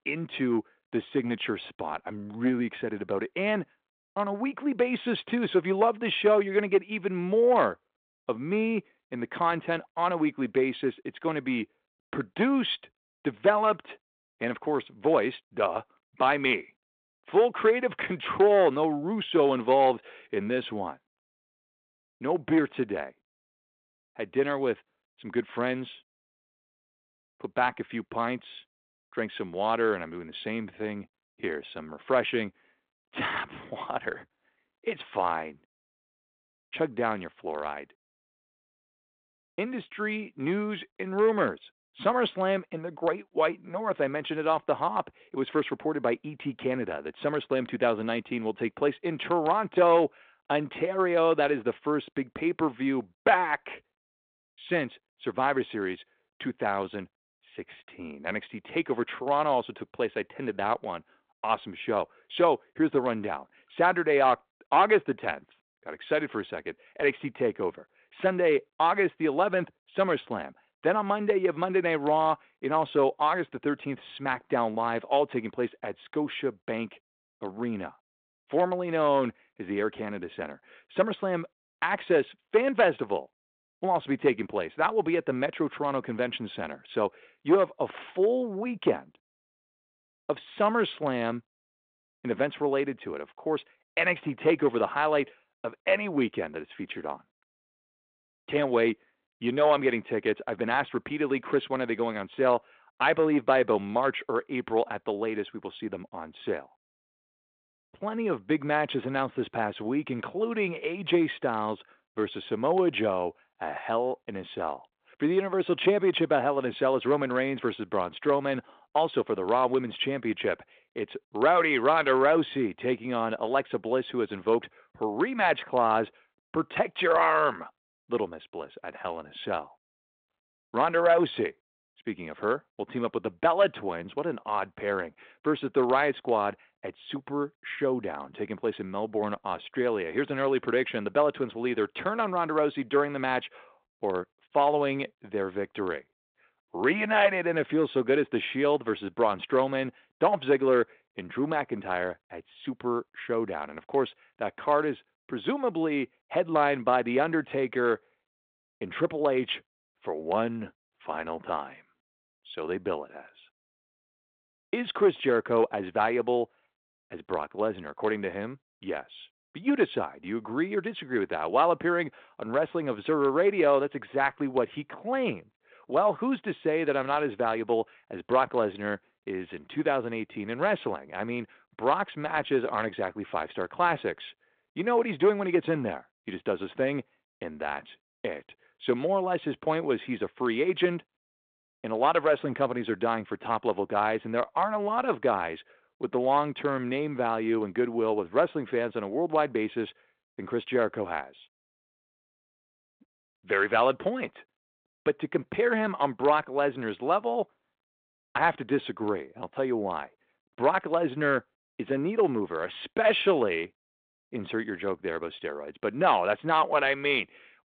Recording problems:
phone-call audio; nothing above 3.5 kHz

